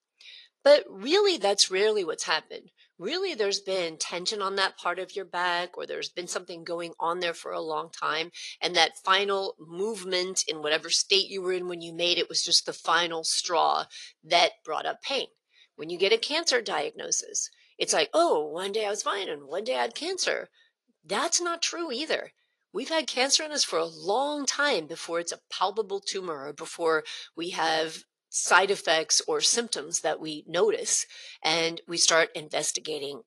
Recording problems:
thin; very; fading below 600 Hz
garbled, watery; slightly

